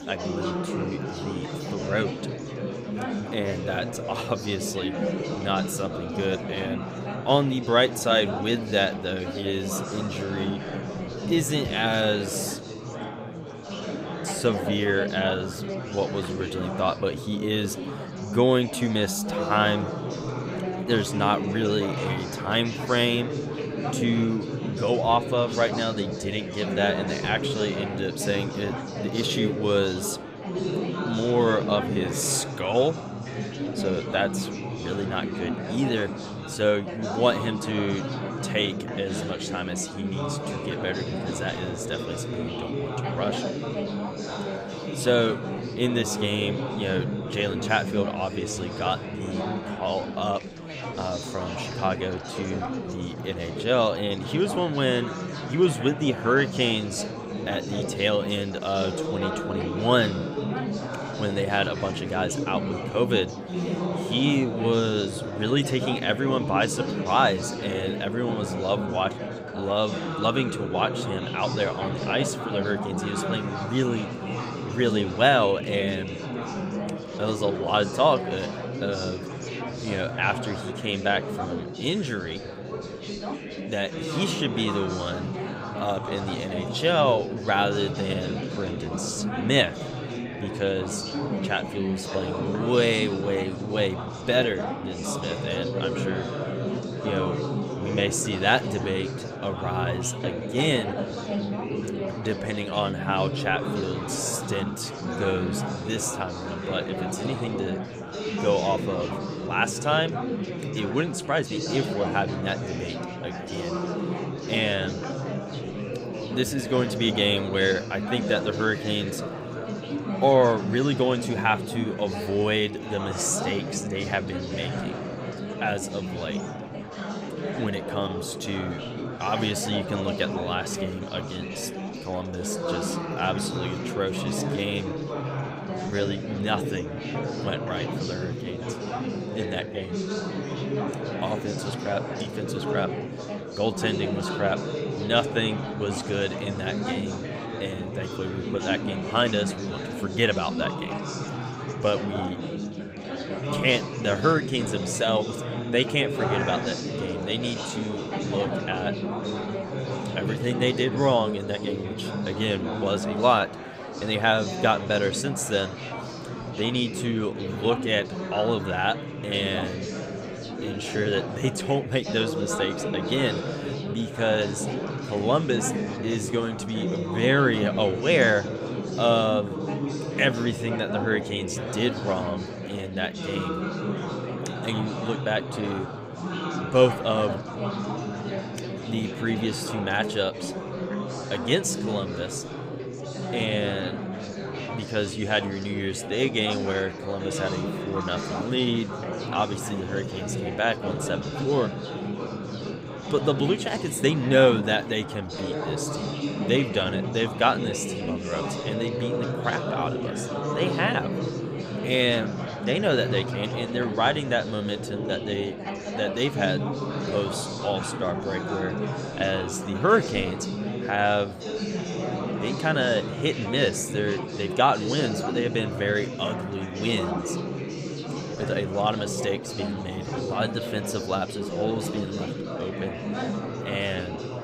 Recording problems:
chatter from many people; loud; throughout; 4 dB below the speech

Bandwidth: 15.5 kHz